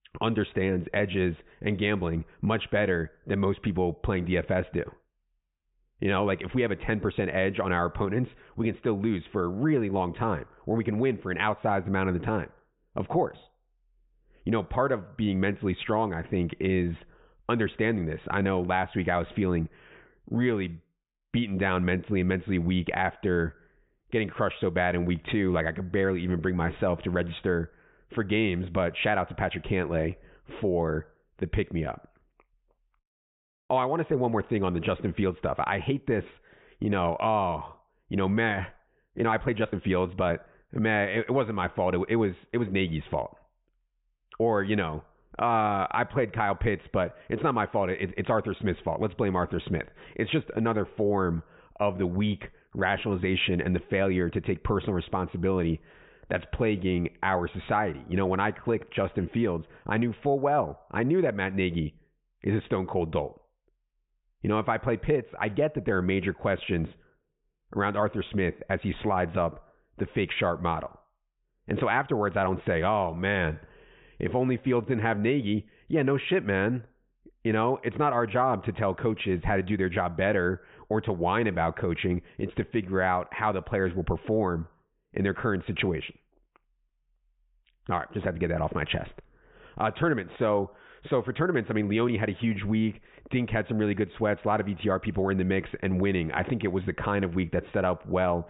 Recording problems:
high frequencies cut off; severe; nothing above 4 kHz
muffled; very slightly; fading above 3 kHz

